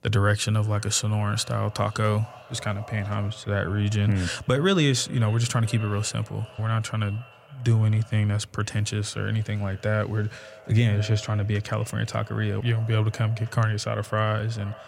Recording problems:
echo of what is said; faint; throughout; 470 ms later, 20 dB below the speech

